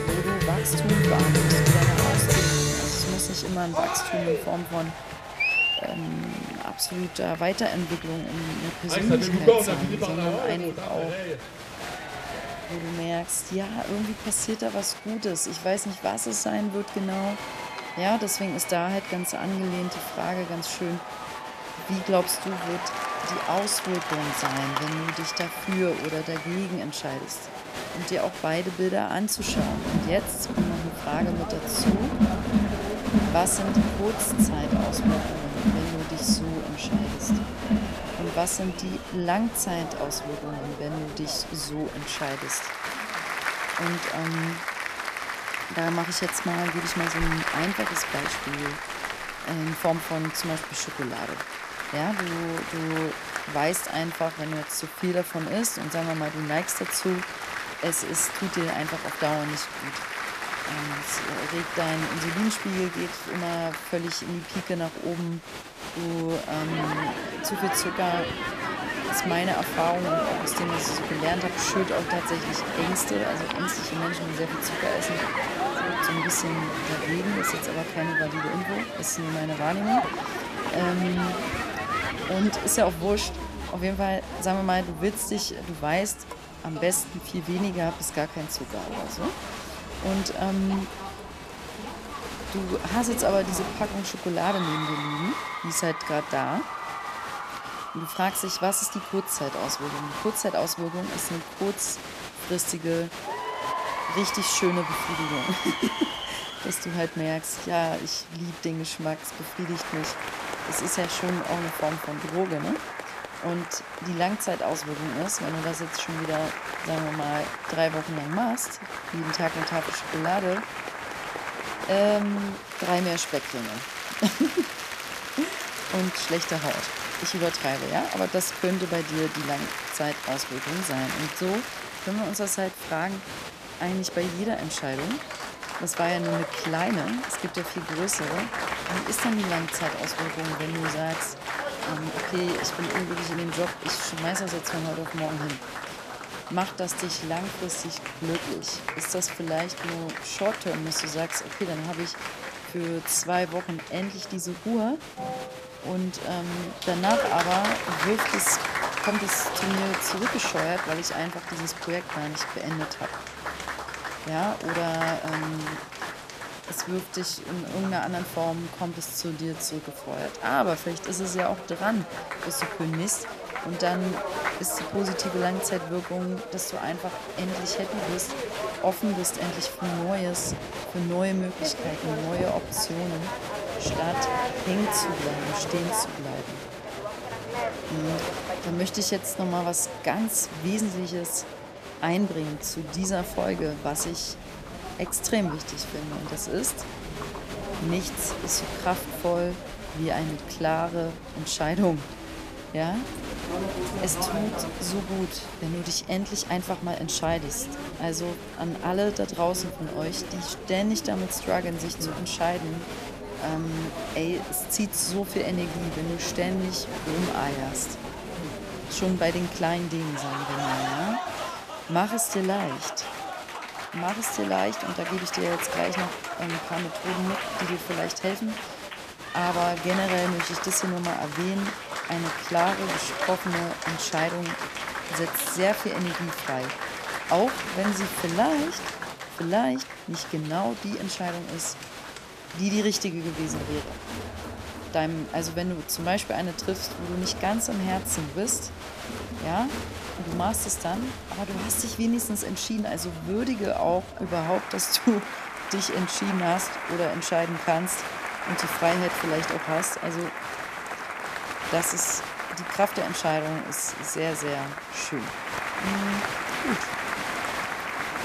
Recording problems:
crowd noise; loud; throughout; 3 dB below the speech

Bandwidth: 14.5 kHz